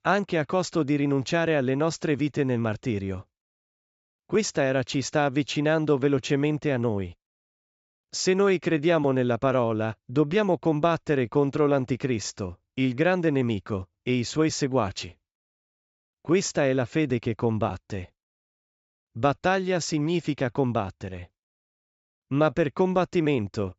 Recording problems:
high frequencies cut off; noticeable; nothing above 8 kHz

